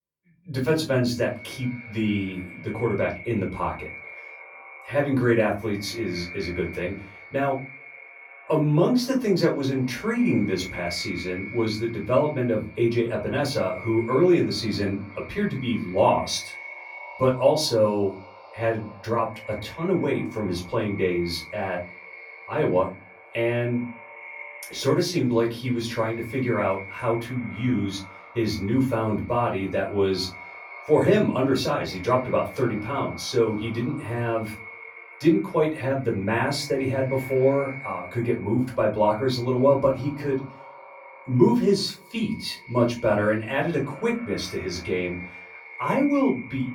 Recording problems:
off-mic speech; far
echo of what is said; noticeable; throughout; 240 ms later, 15 dB below the speech
room echo; slight; dies away in 0.3 s

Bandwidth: 17.5 kHz